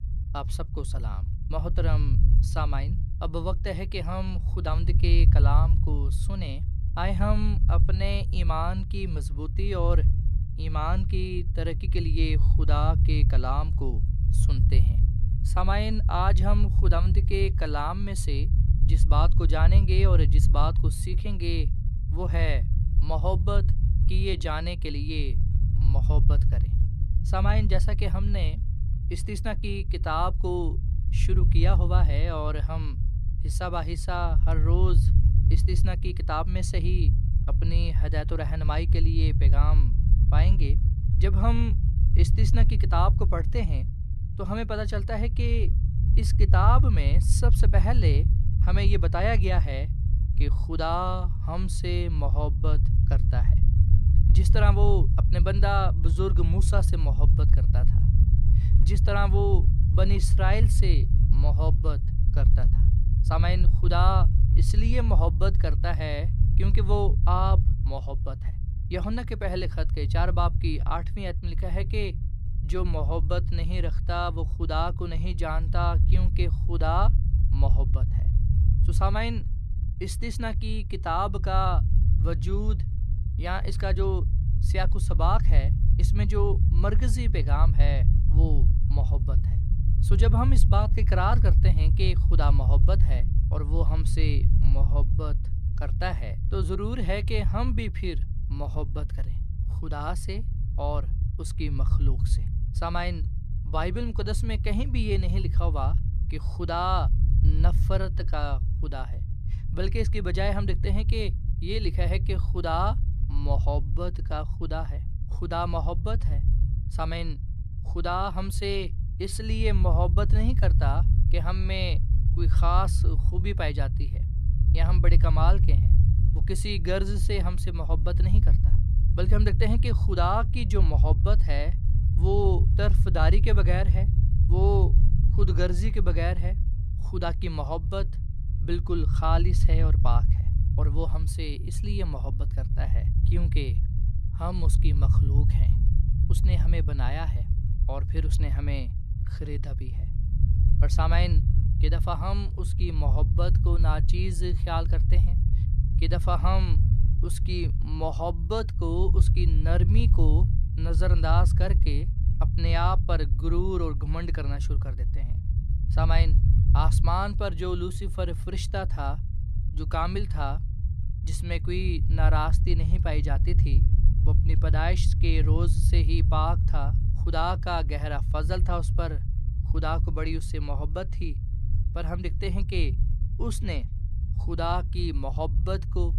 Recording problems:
low rumble; loud; throughout; 10 dB below the speech

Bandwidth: 14.5 kHz